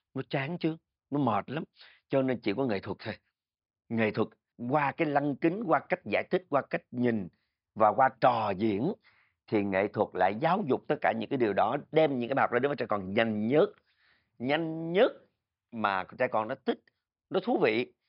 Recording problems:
high frequencies cut off; noticeable; nothing above 5.5 kHz

